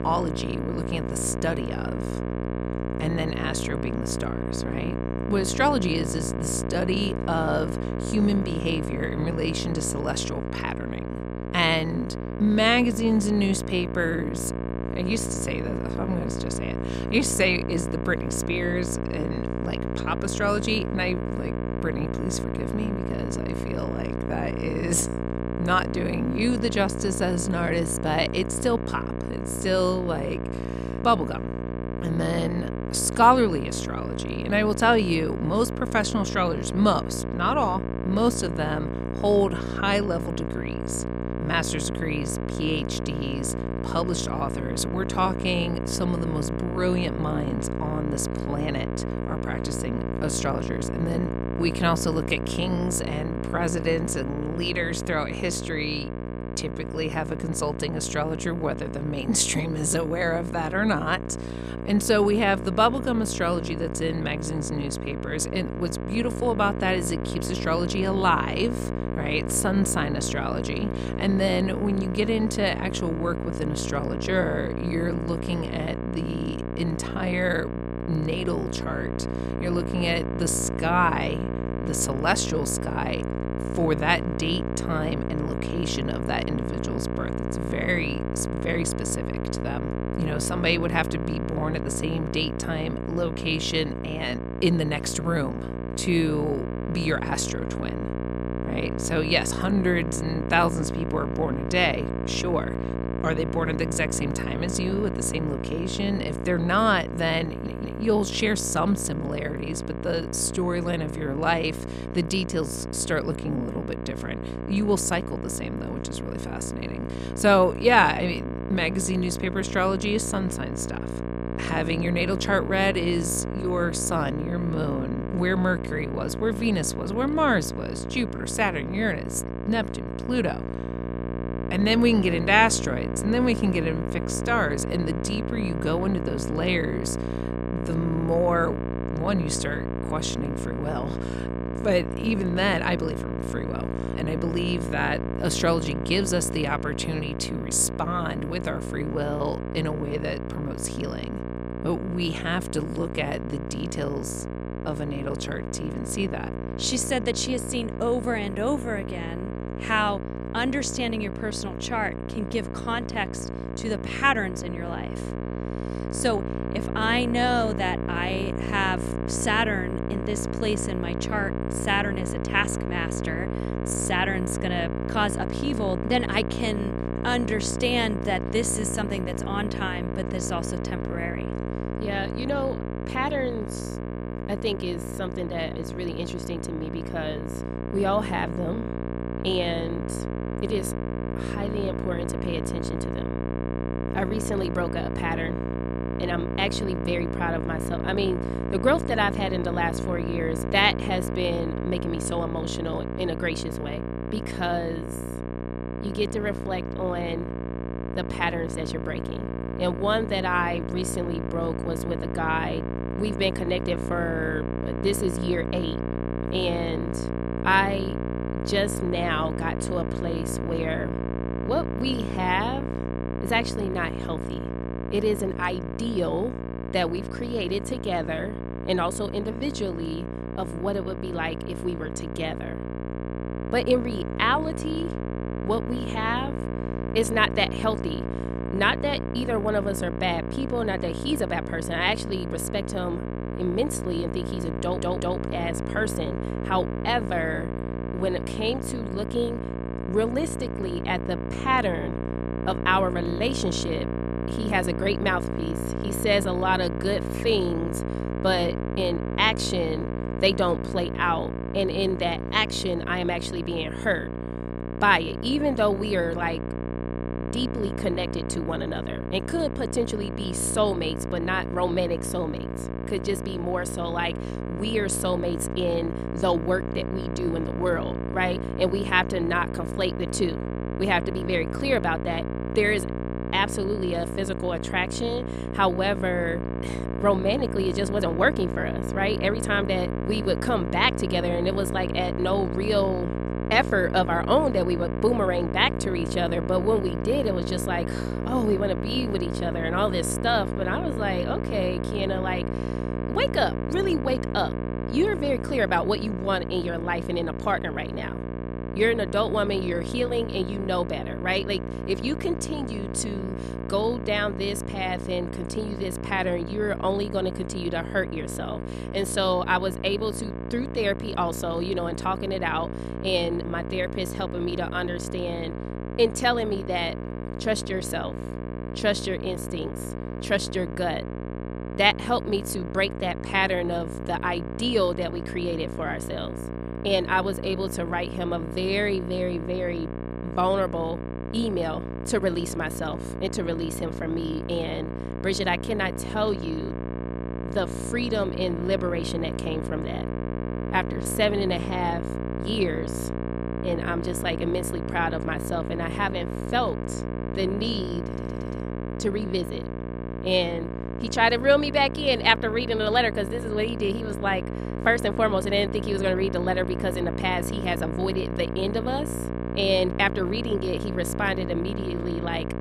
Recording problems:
electrical hum; loud; throughout; 60 Hz, 8 dB below the speech
audio stuttering; at 1:47, at 4:05 and at 5:58

